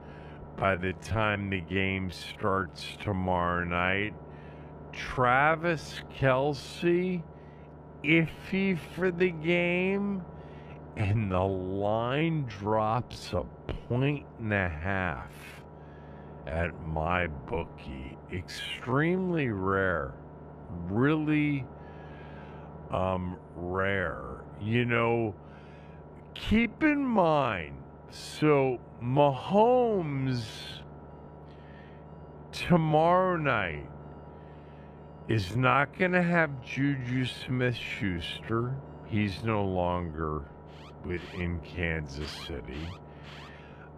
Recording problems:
wrong speed, natural pitch; too slow; 0.5 times normal speed
alarms or sirens; faint; throughout; 25 dB below the speech
low rumble; faint; throughout; 20 dB below the speech

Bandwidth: 14.5 kHz